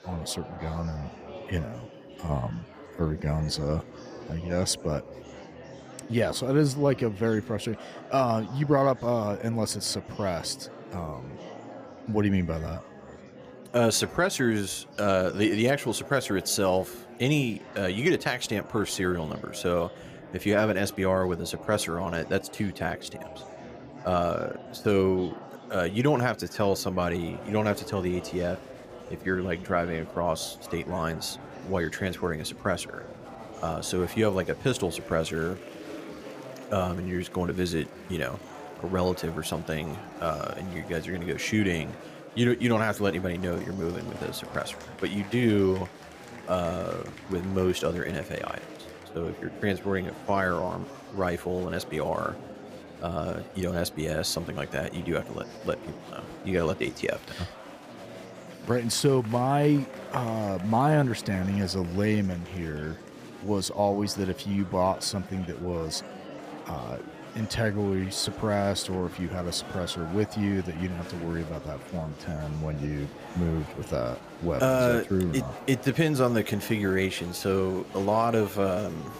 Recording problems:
murmuring crowd; noticeable; throughout; 15 dB below the speech

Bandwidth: 15 kHz